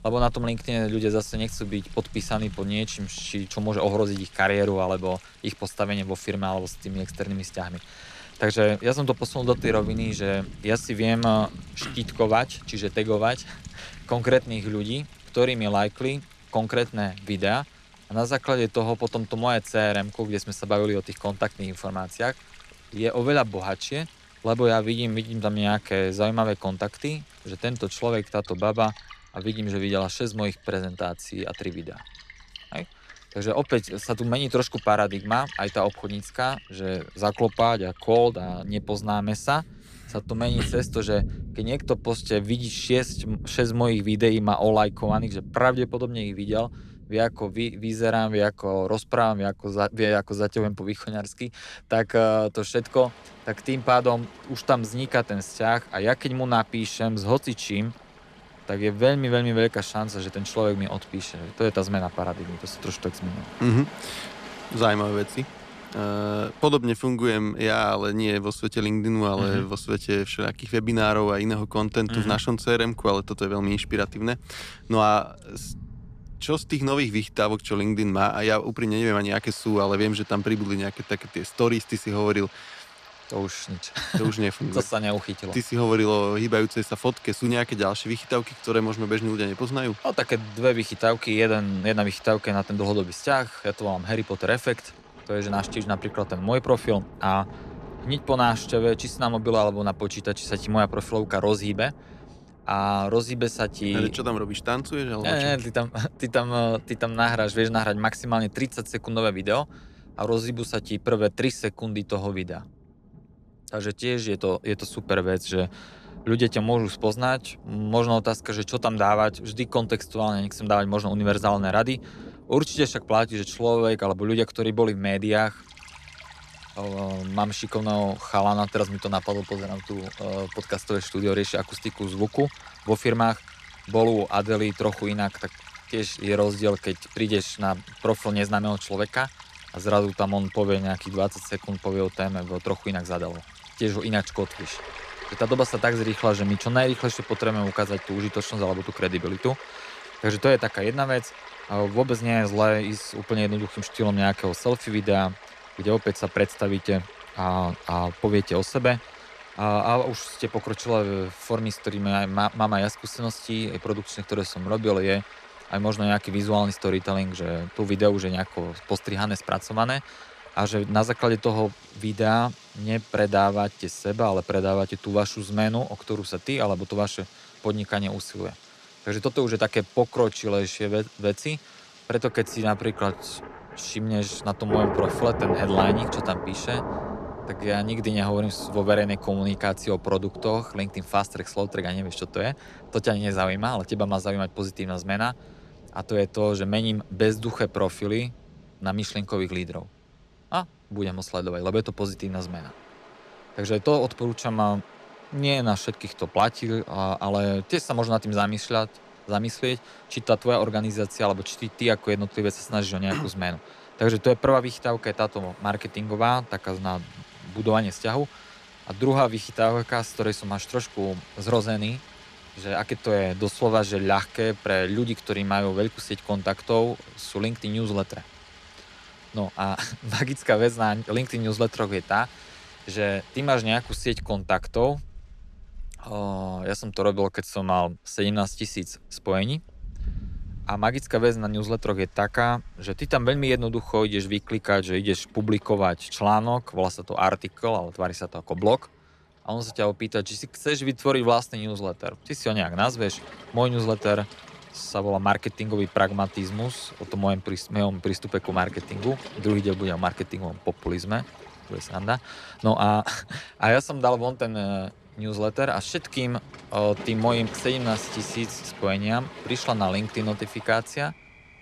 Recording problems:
rain or running water; noticeable; throughout; 15 dB below the speech

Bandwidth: 14 kHz